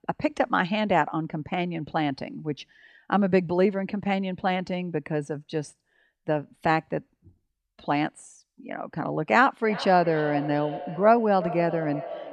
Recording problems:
echo of what is said; strong; from 9.5 s on; 370 ms later, 10 dB below the speech

